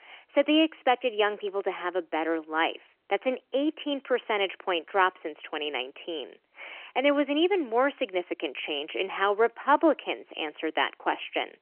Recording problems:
phone-call audio; nothing above 3 kHz

